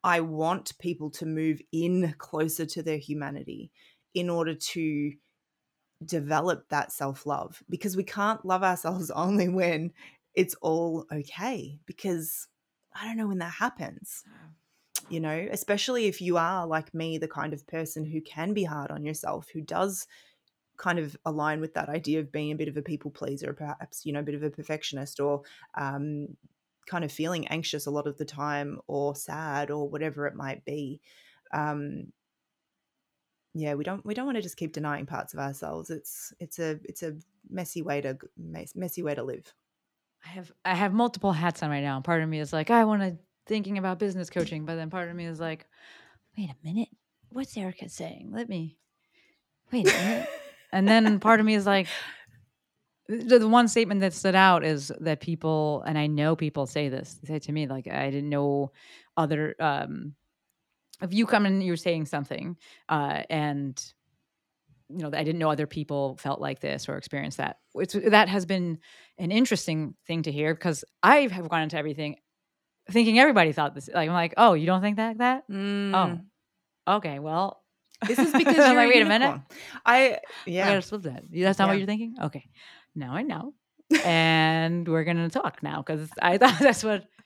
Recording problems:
none

